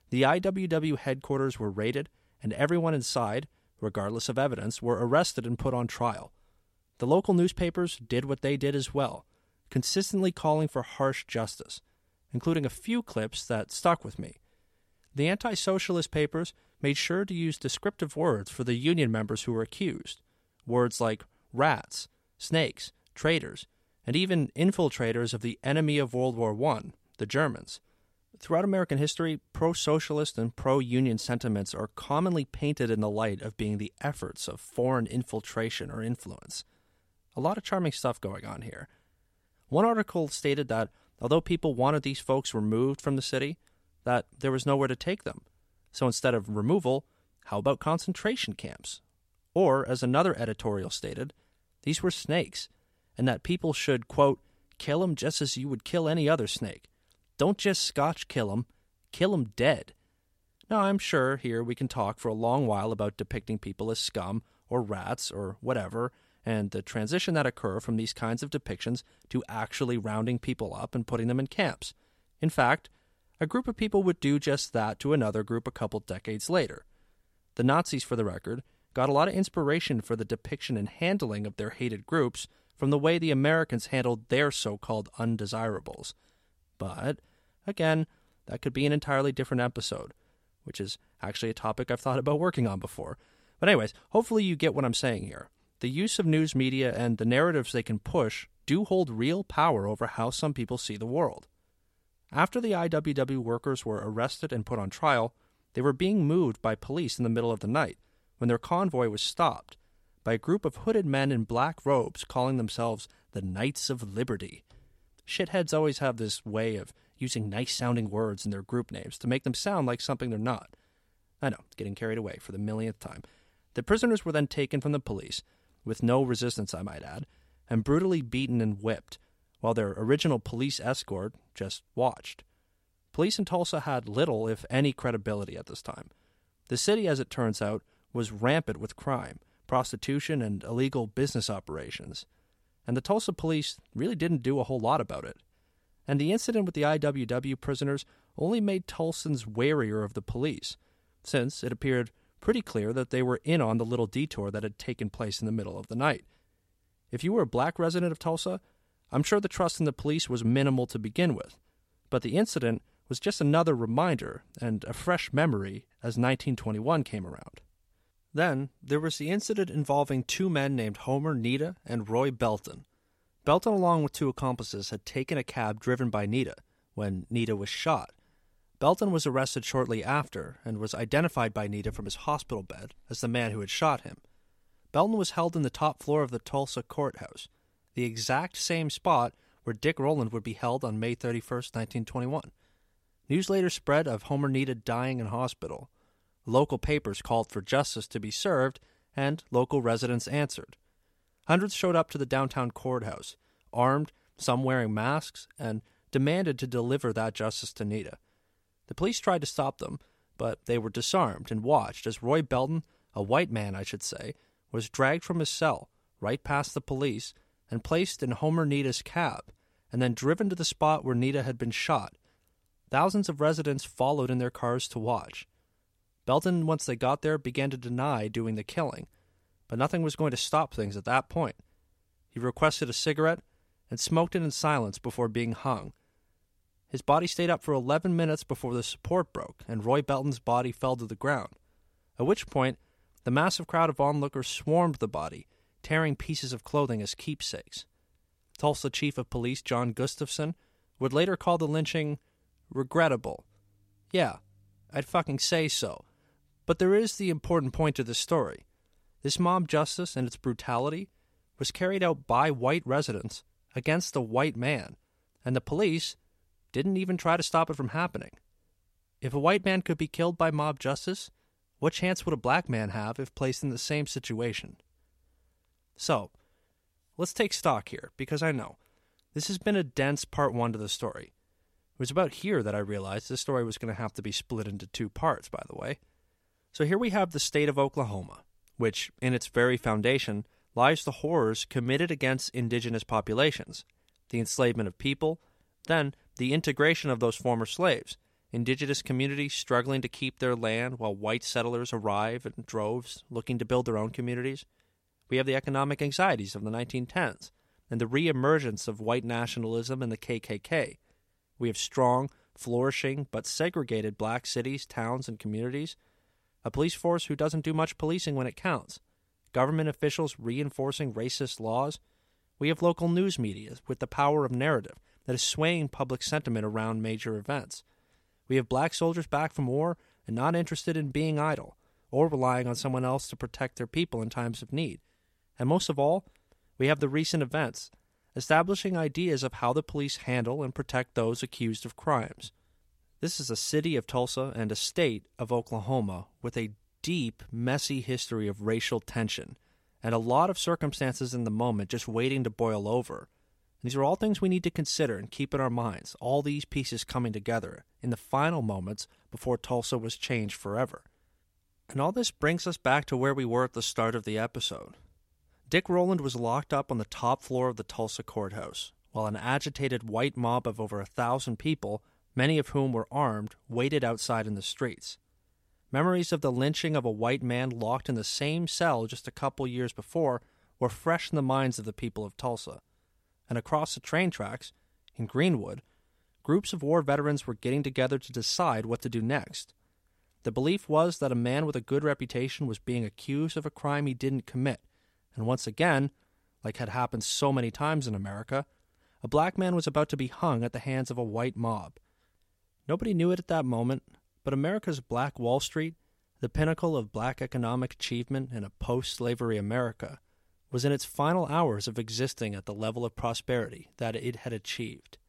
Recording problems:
none

